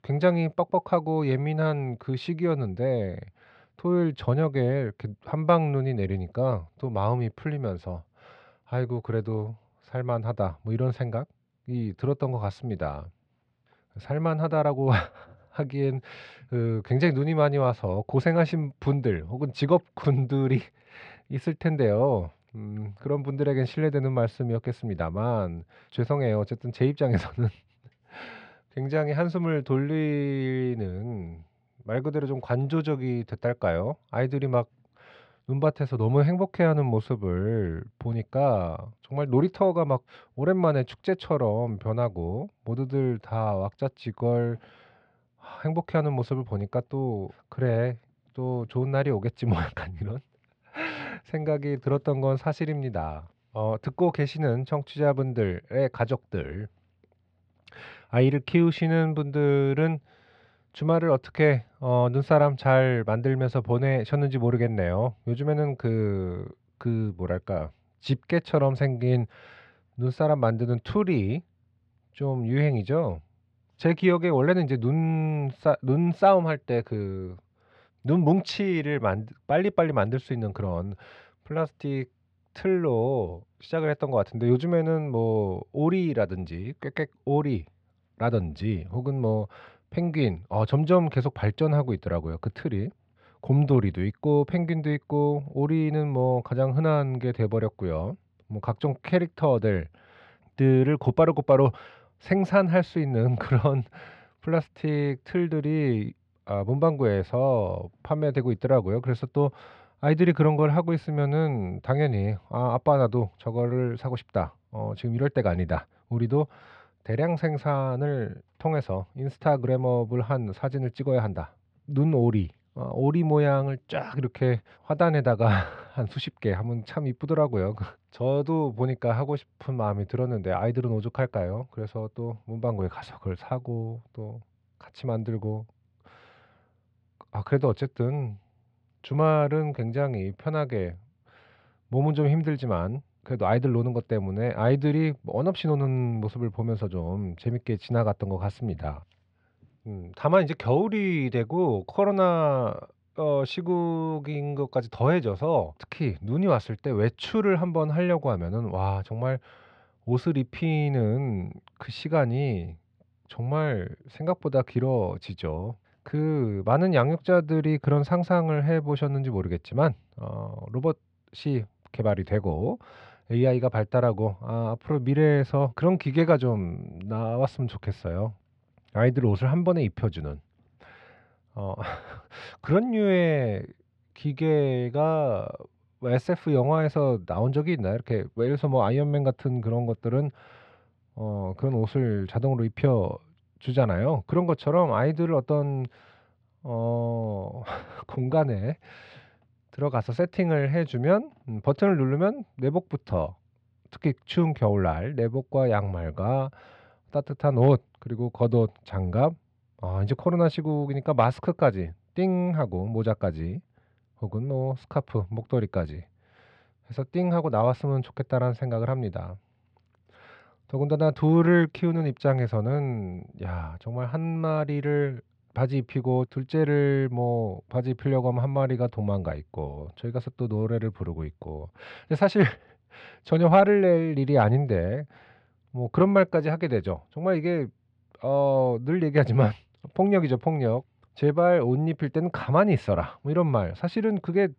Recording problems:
muffled; very slightly; fading above 3 kHz

